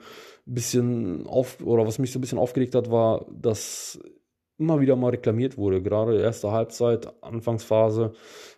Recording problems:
none

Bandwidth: 13.5 kHz